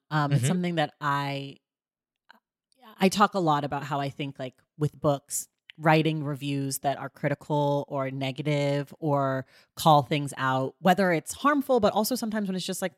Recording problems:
none

